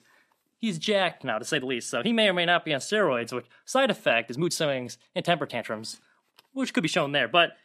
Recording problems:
uneven, jittery; strongly; from 0.5 to 7 s

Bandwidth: 14.5 kHz